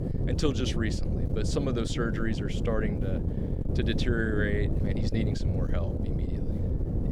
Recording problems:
wind noise on the microphone; heavy; 5 dB below the speech

